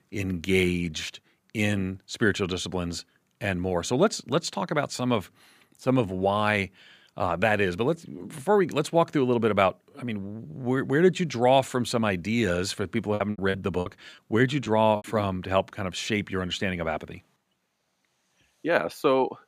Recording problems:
choppy; very; from 13 to 15 s; 20% of the speech affected

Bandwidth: 15 kHz